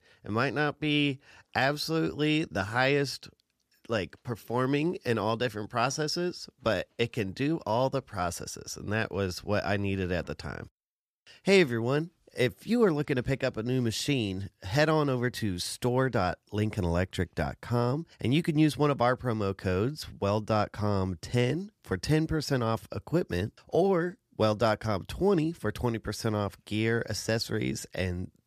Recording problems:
none

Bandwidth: 14.5 kHz